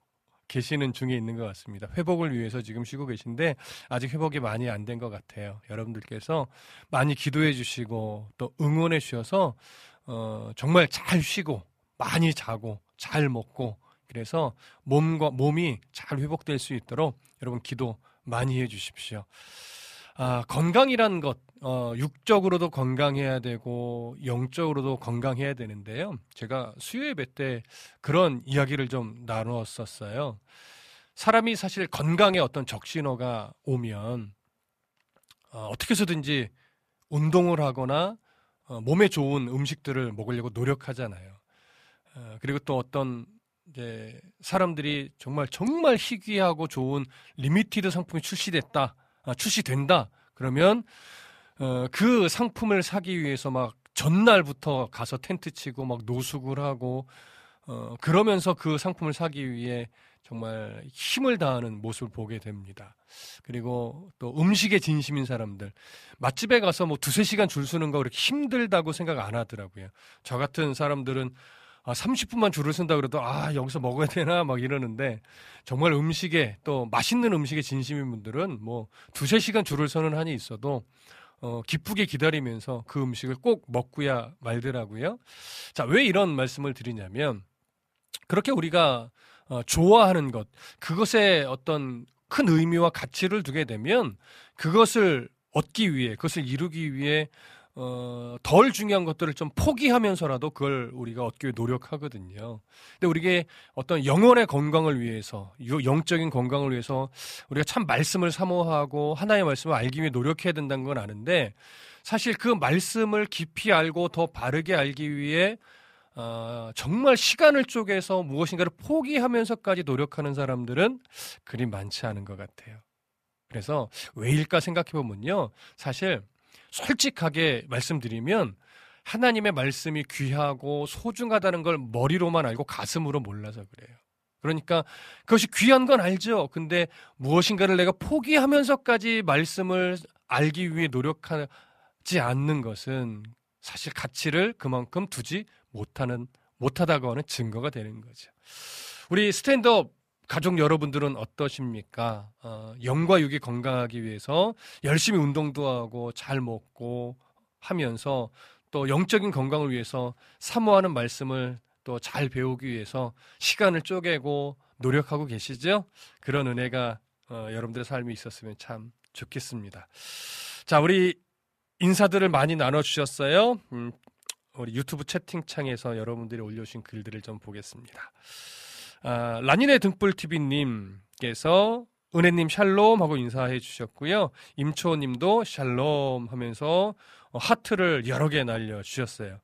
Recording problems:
none

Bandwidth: 14.5 kHz